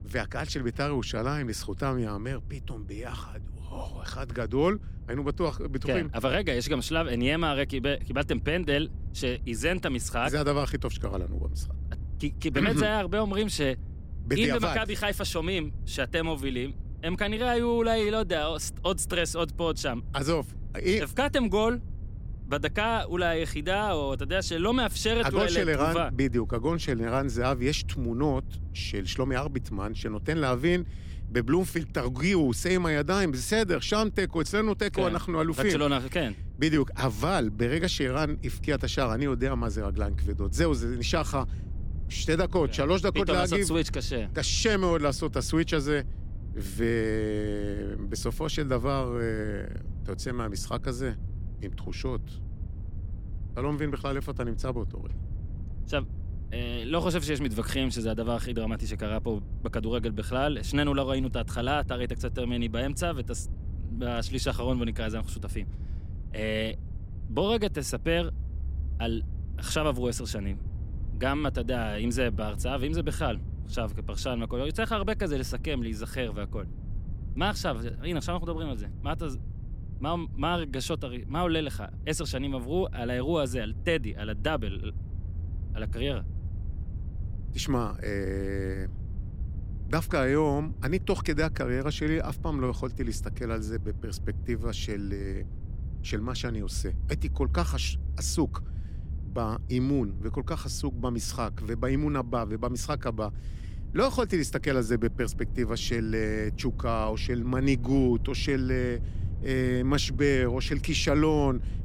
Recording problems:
low rumble; faint; throughout; 20 dB below the speech

